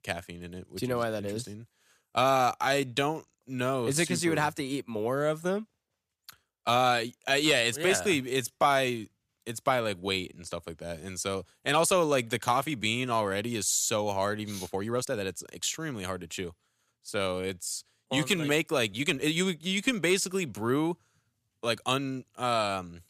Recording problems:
uneven, jittery; strongly; from 2 to 22 s

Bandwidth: 14.5 kHz